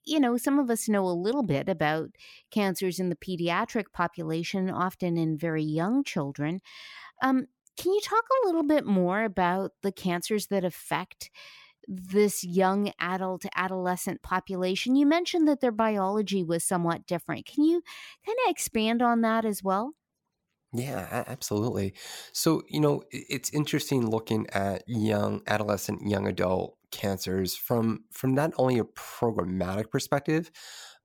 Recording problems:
none

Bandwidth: 17.5 kHz